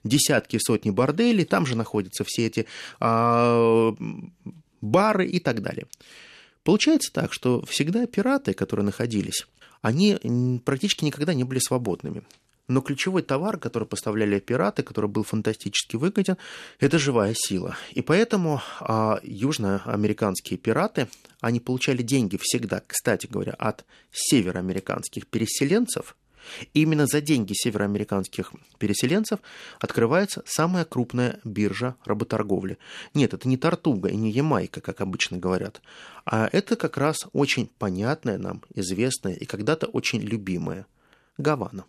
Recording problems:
none

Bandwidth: 13.5 kHz